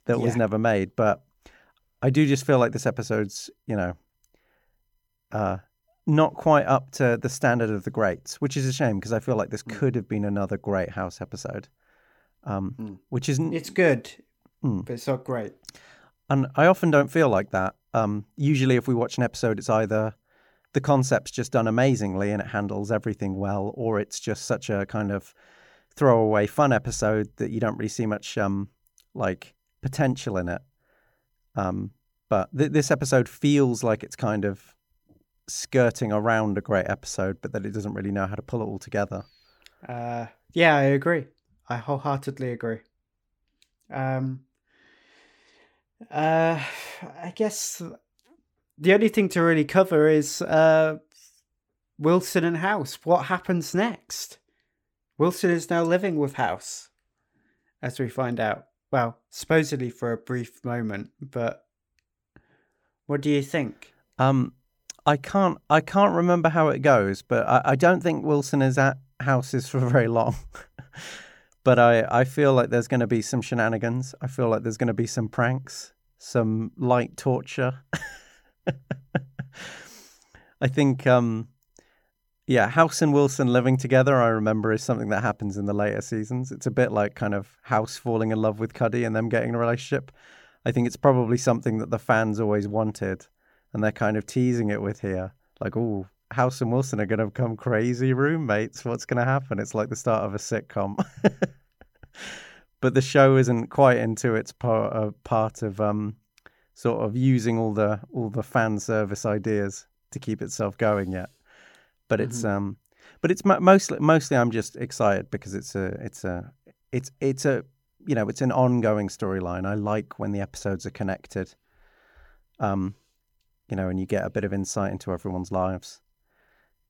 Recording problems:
none

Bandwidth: 18 kHz